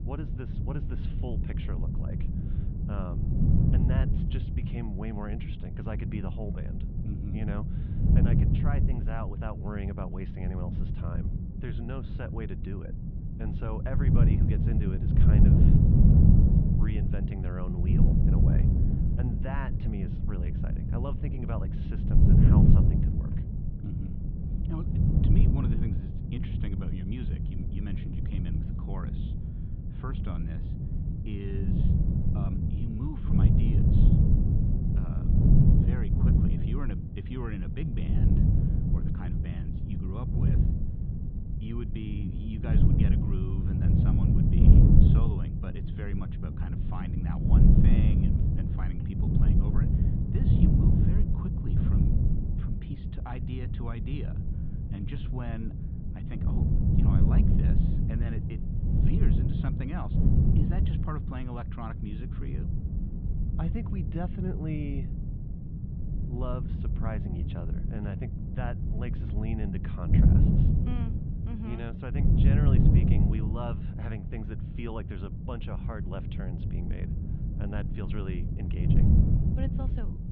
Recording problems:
muffled; very; fading above 3.5 kHz
wind noise on the microphone; heavy; 4 dB above the speech

